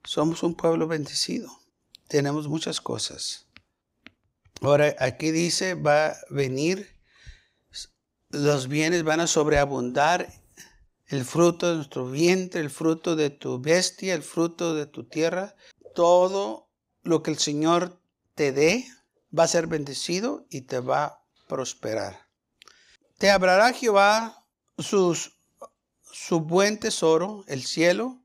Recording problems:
none

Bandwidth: 15.5 kHz